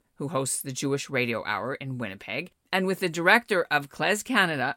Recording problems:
none

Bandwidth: 17 kHz